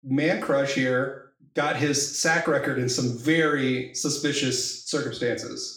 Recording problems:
off-mic speech; far
room echo; slight; dies away in 0.5 s

